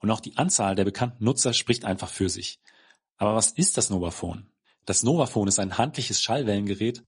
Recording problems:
garbled, watery; slightly; nothing above 10 kHz

